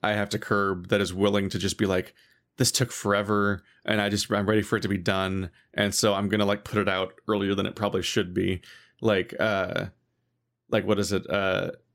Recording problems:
none

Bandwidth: 16 kHz